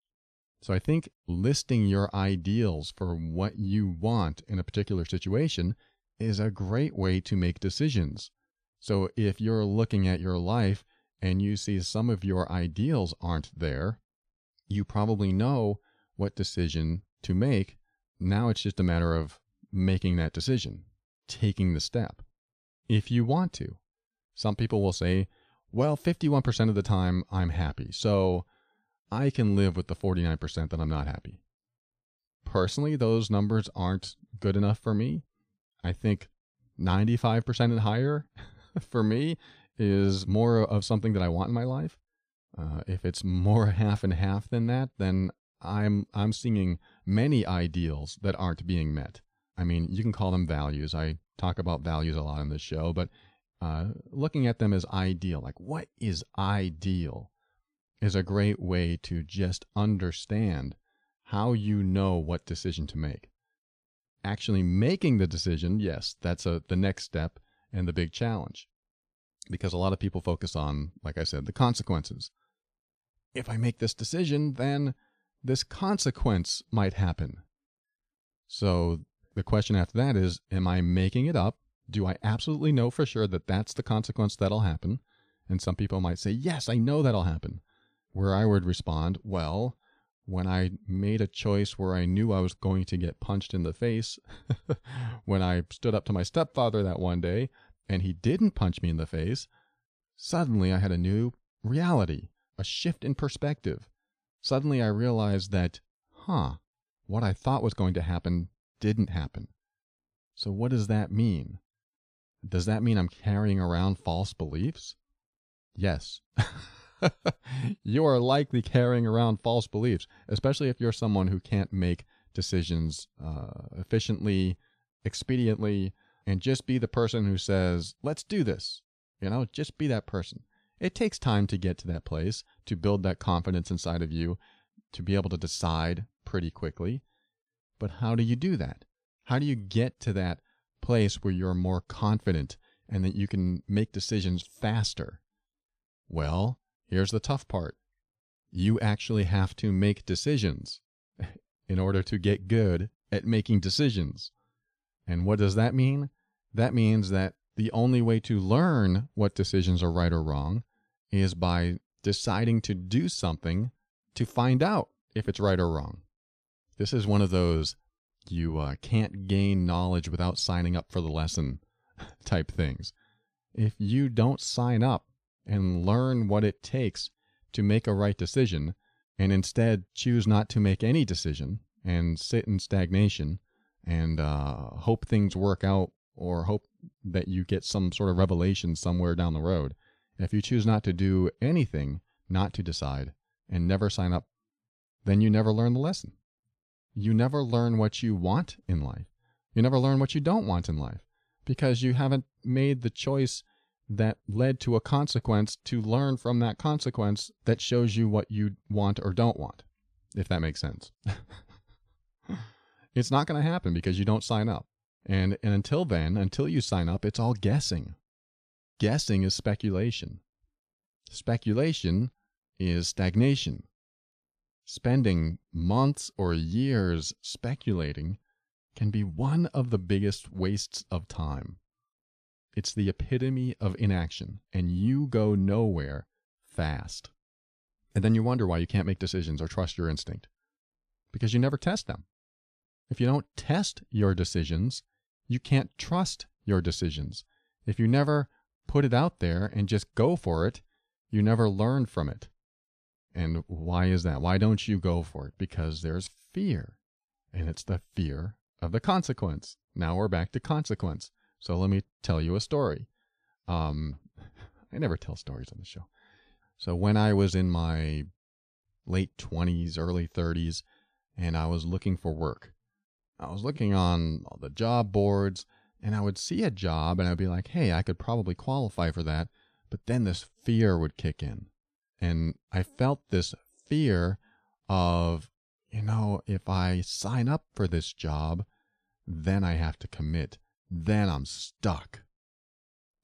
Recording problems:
none

